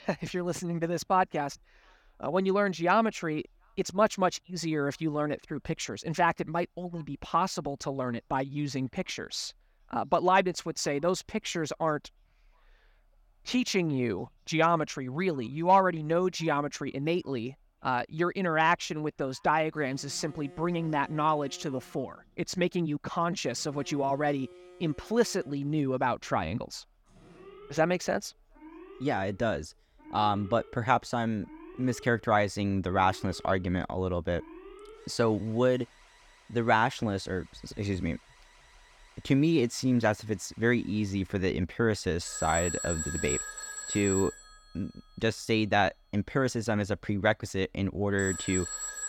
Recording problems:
alarms or sirens; noticeable; from 18 s on; 10 dB below the speech

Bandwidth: 17.5 kHz